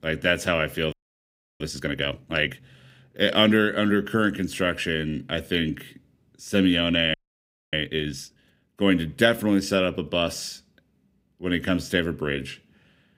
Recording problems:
audio freezing; at 1 s for 0.5 s and at 7 s for 0.5 s

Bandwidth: 15.5 kHz